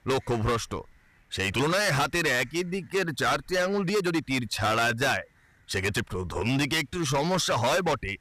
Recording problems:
distortion; heavy; 15% of the sound clipped
uneven, jittery; strongly; from 1 to 7.5 s

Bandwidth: 14.5 kHz